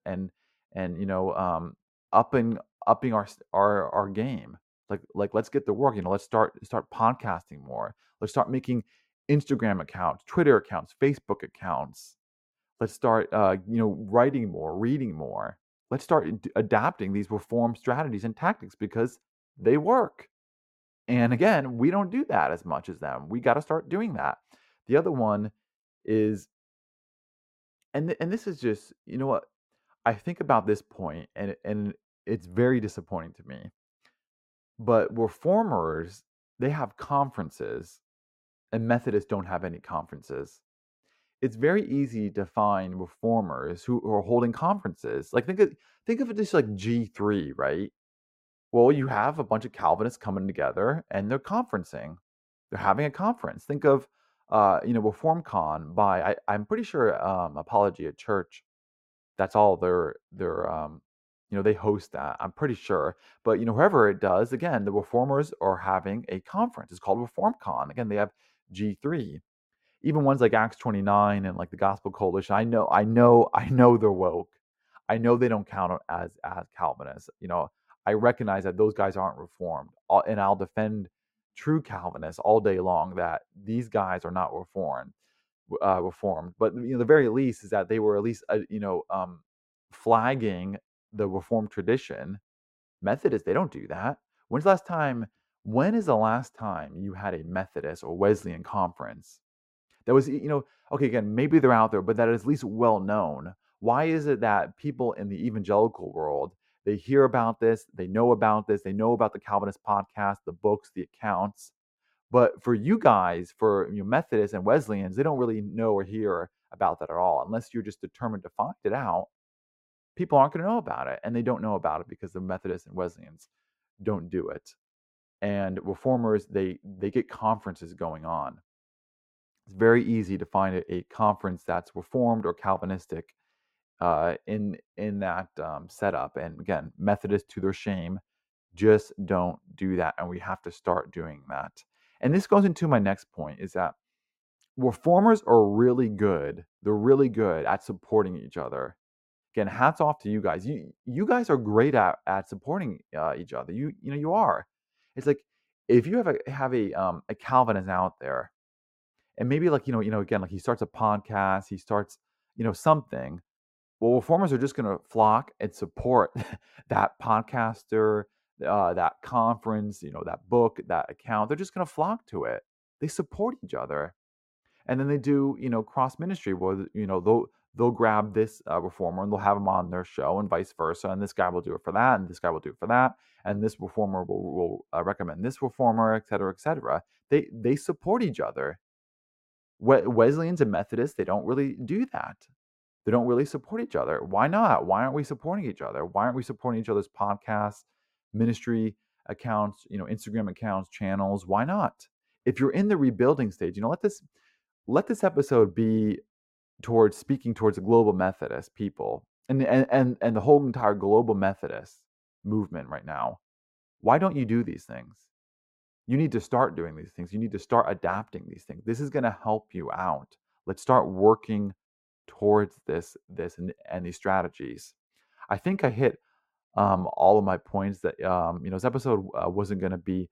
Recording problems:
muffled; slightly; fading above 2 kHz

